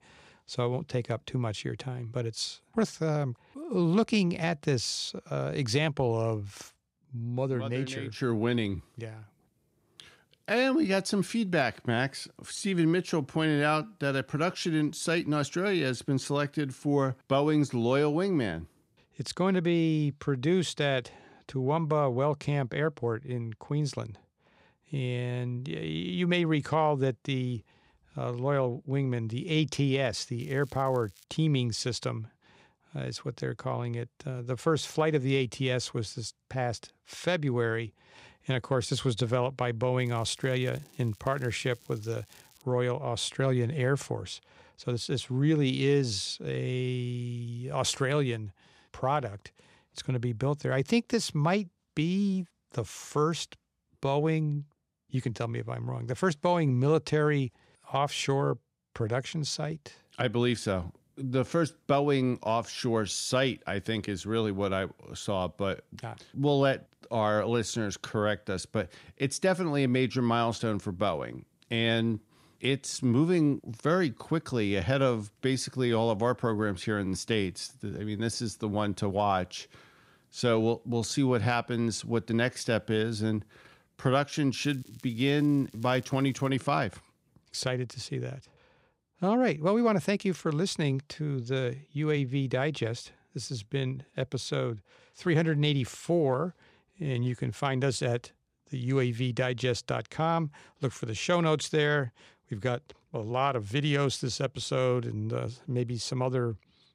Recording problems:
crackling; faint; at 30 s, from 40 to 43 s and from 1:25 to 1:26; 25 dB below the speech

